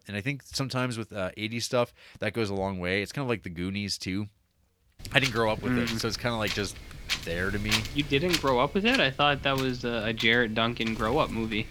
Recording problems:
wind noise on the microphone; heavy; from 5 s on; 6 dB below the speech

